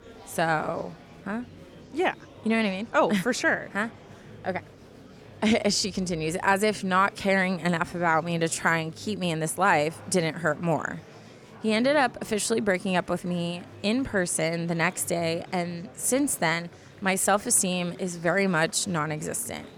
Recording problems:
murmuring crowd; faint; throughout; 20 dB below the speech

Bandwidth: 18.5 kHz